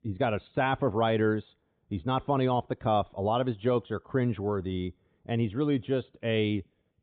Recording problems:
high frequencies cut off; severe; nothing above 4 kHz

